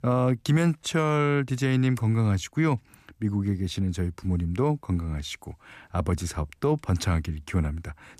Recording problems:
none

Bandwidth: 14.5 kHz